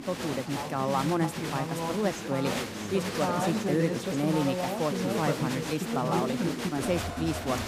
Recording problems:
crowd noise; loud; throughout; as loud as the speech

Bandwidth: 15 kHz